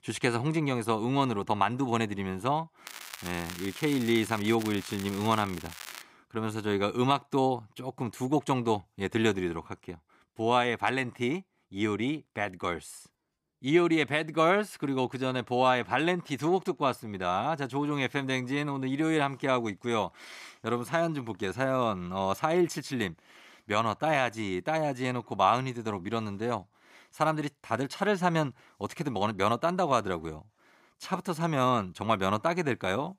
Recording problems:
crackling; noticeable; from 3 to 6 s; 15 dB below the speech

